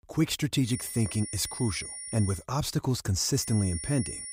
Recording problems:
high-pitched whine; loud; from 0.5 to 2.5 s and at 3.5 s; 9.5 kHz, 8 dB below the speech

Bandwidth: 15.5 kHz